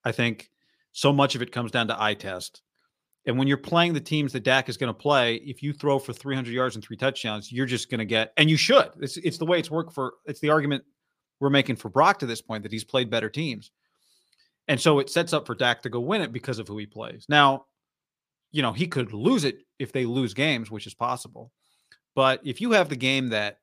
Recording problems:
none

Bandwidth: 15 kHz